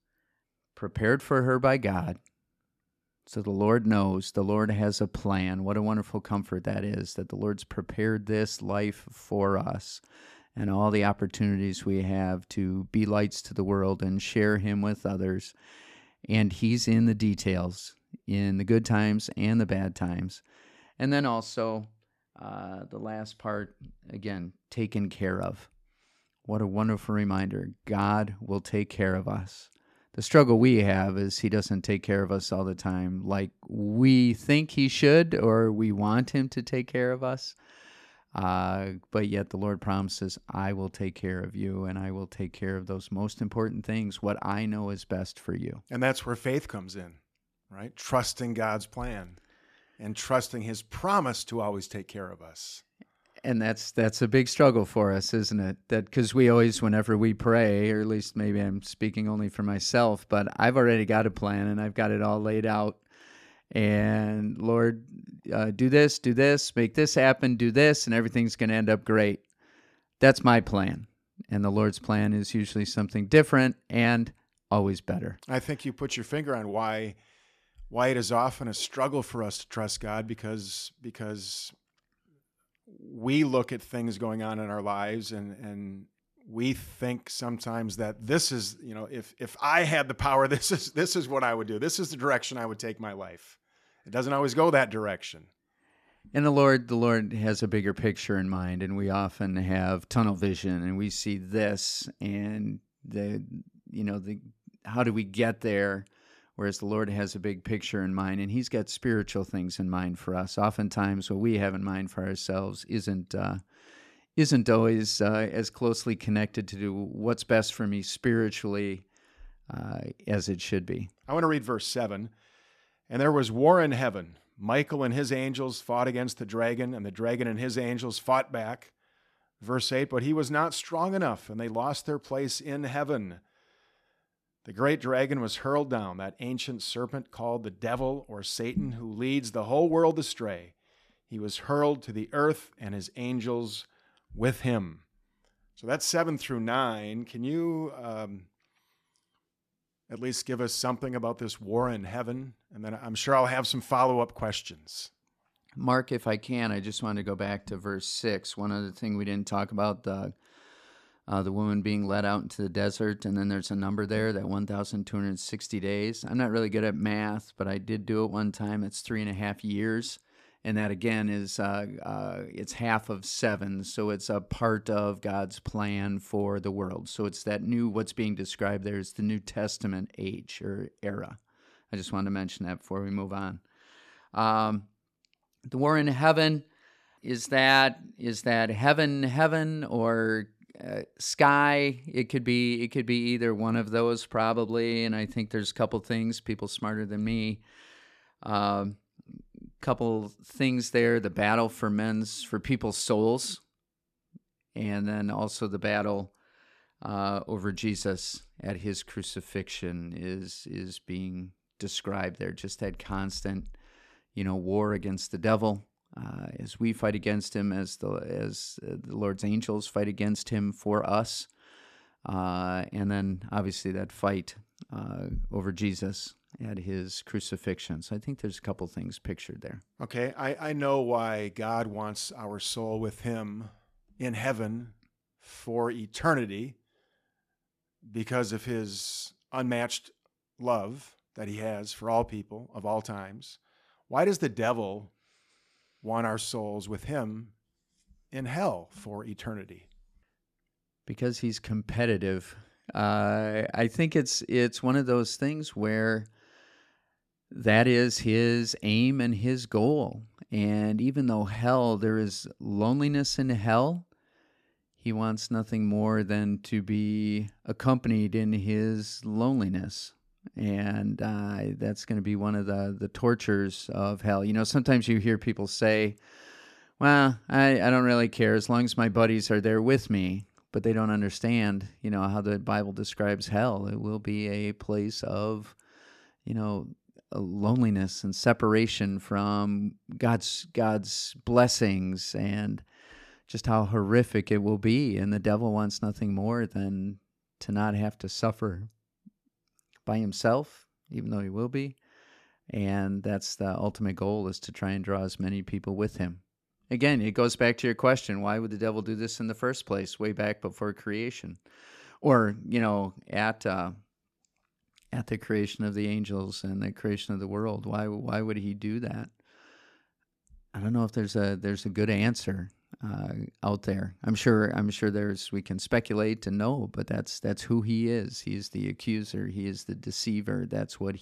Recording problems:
none

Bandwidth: 14.5 kHz